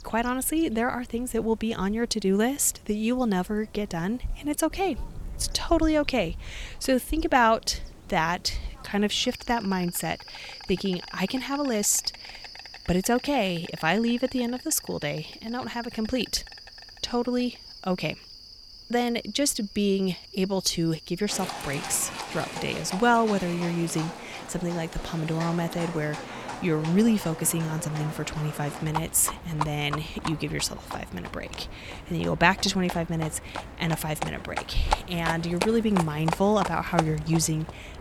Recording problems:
animal sounds; noticeable; throughout; 10 dB below the speech

